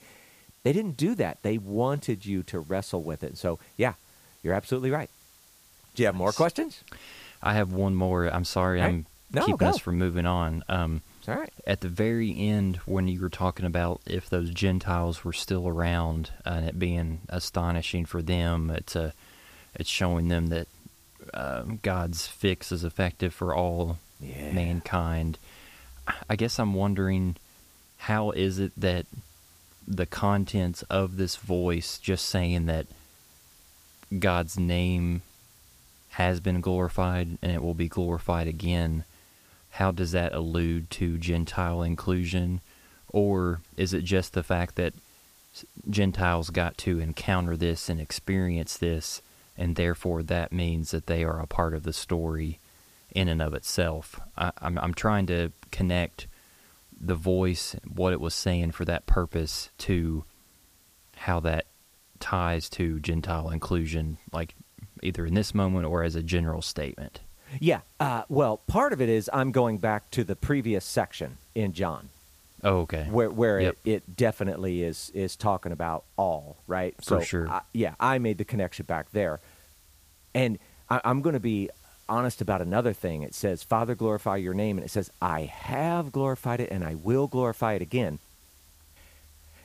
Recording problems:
hiss; faint; throughout; 25 dB below the speech

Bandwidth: 15 kHz